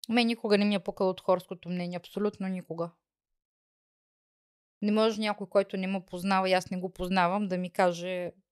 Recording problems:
none

